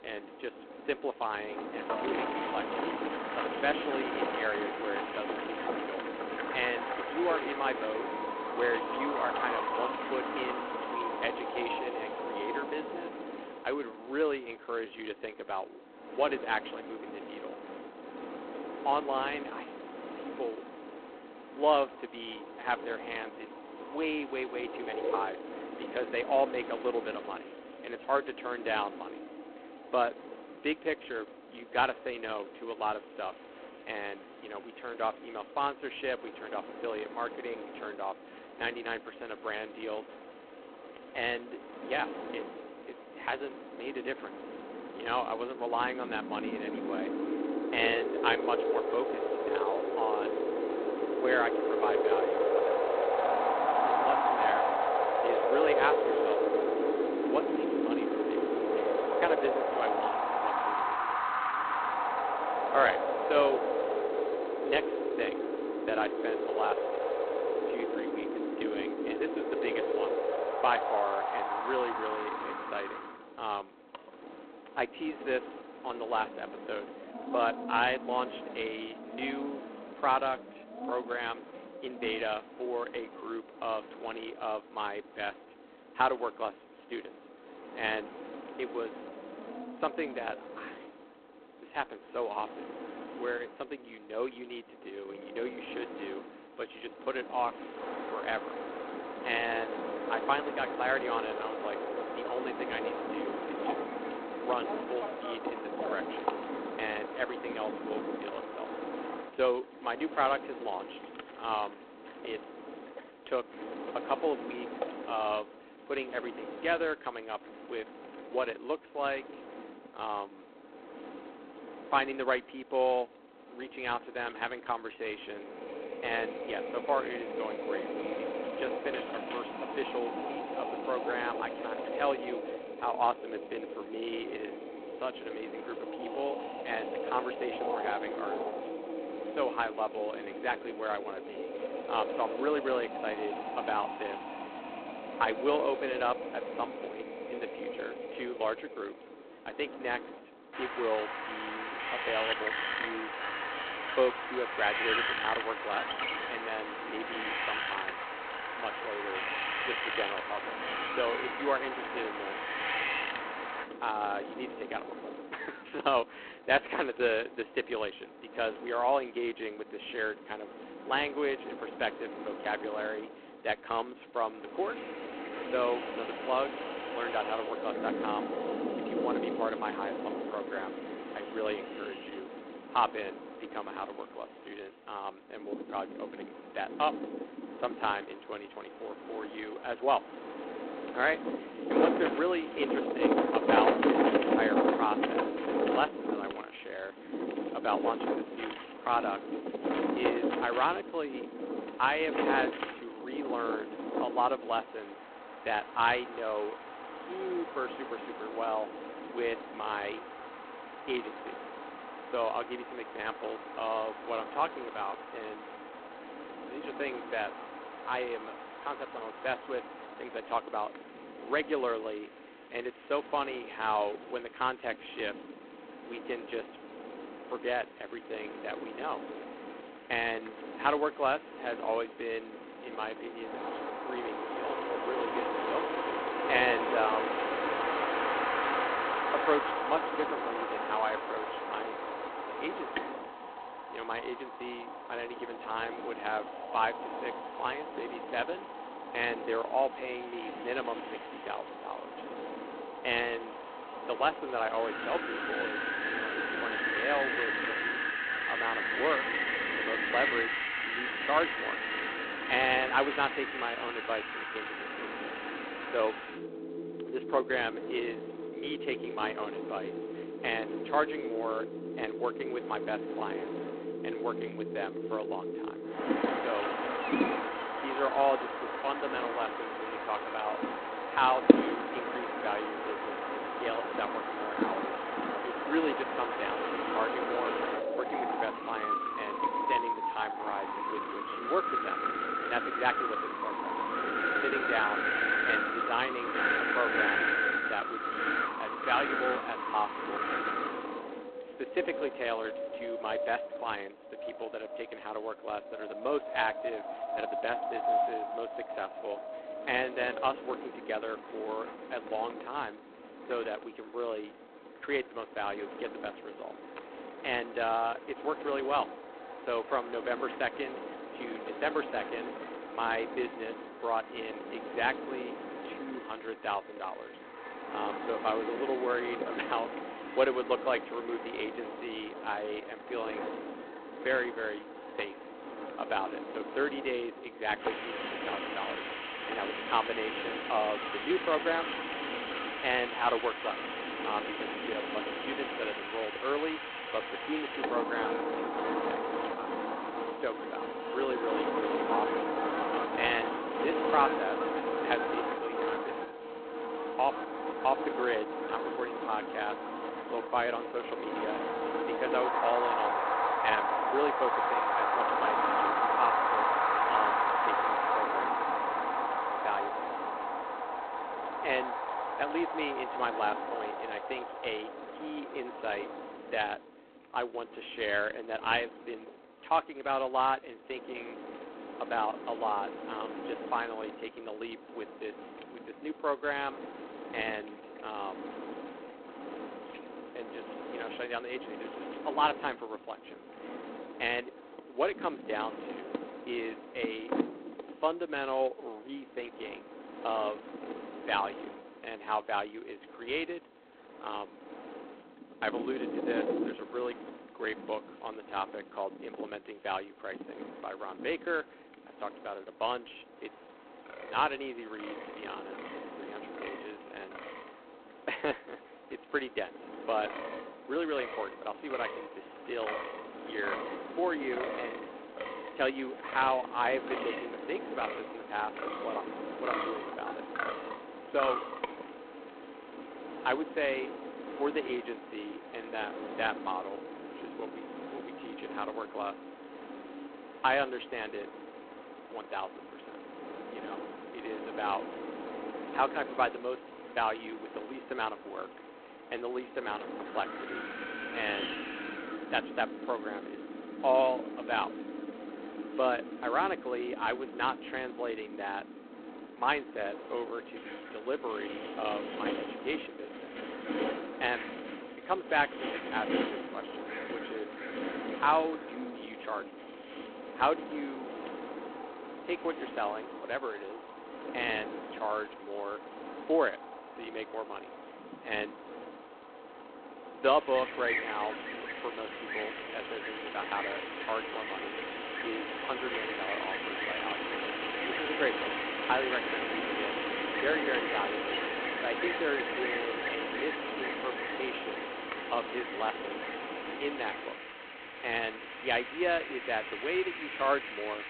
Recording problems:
phone-call audio; poor line; nothing above 3.5 kHz
wind in the background; loud; throughout; as loud as the speech

